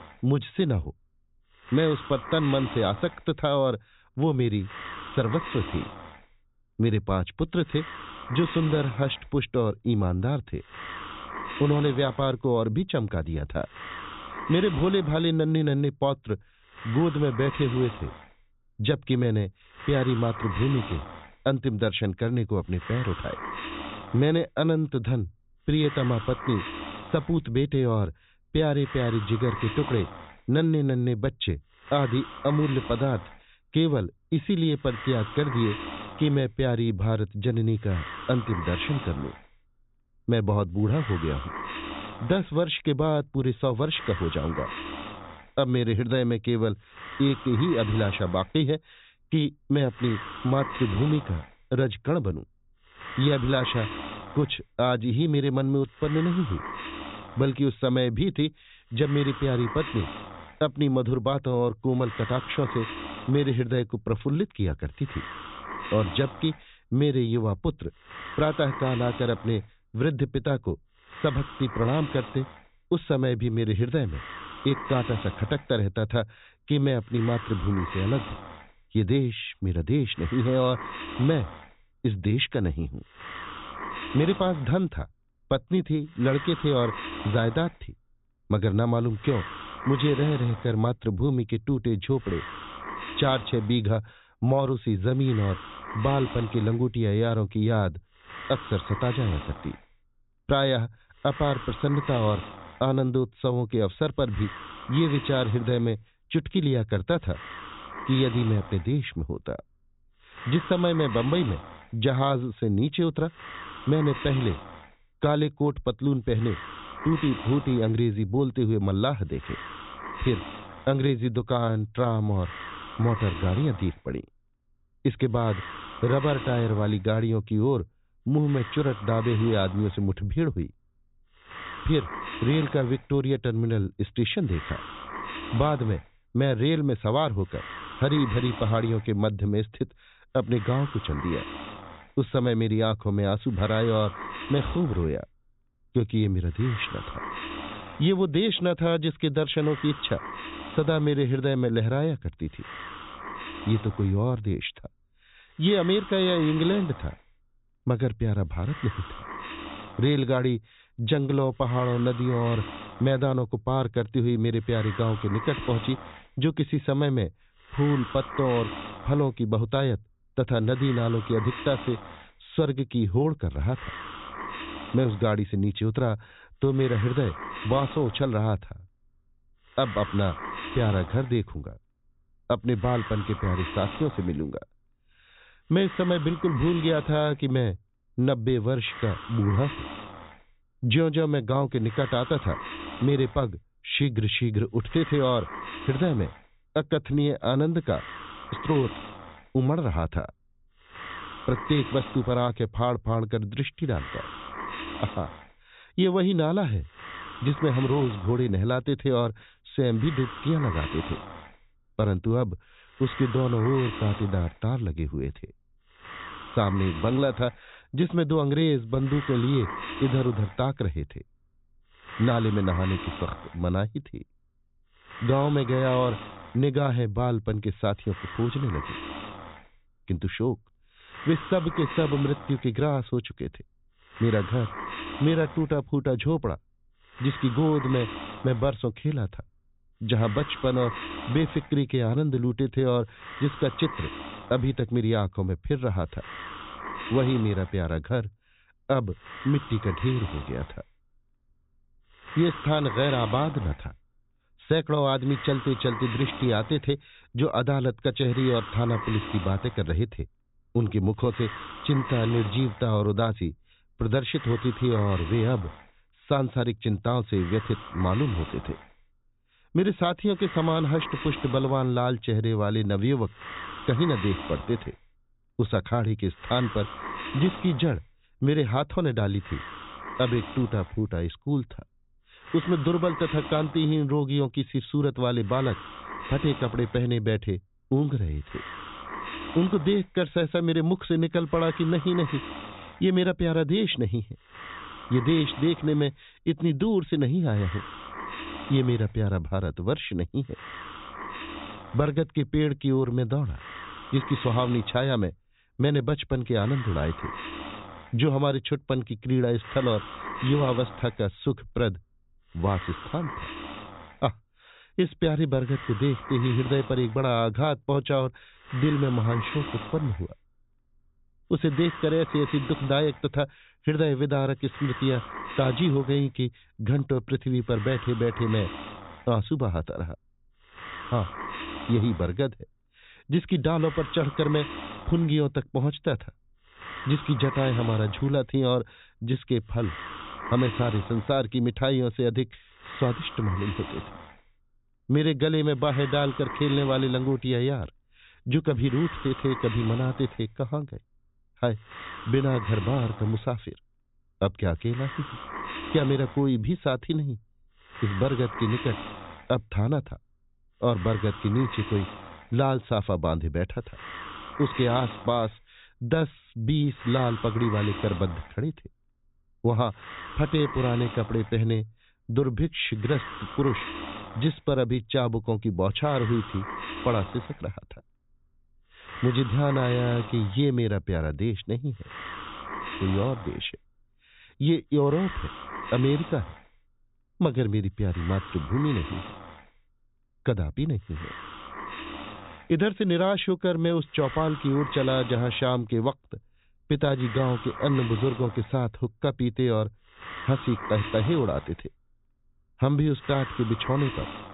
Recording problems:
high frequencies cut off; severe; nothing above 4 kHz
hiss; noticeable; throughout; 10 dB below the speech

